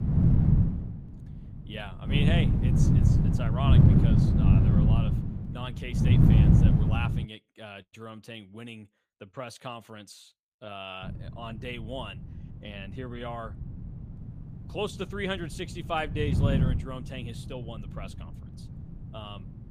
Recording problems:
wind noise on the microphone; heavy; until 7.5 s and from 11 s on; 4 dB above the speech

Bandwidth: 15 kHz